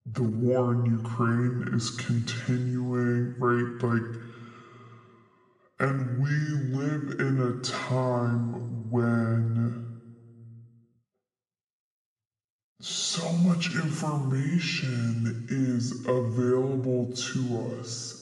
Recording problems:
wrong speed and pitch; too slow and too low; 0.7 times normal speed
room echo; noticeable; dies away in 1.8 s
off-mic speech; somewhat distant

